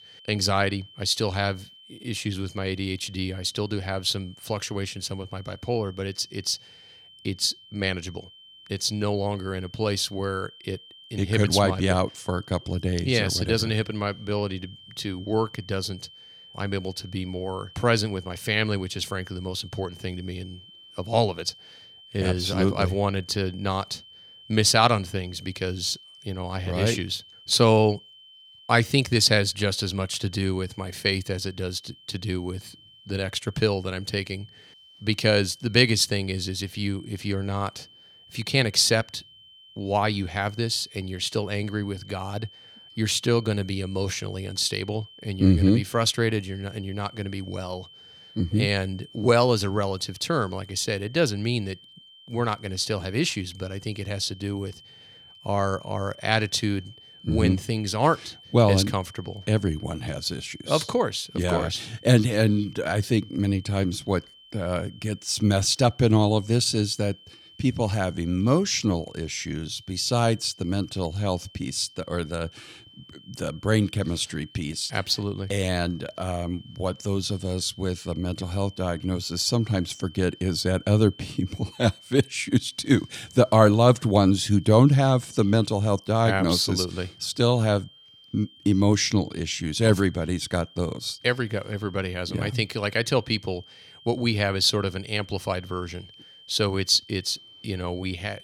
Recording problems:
high-pitched whine; faint; throughout; 3 kHz, 25 dB below the speech

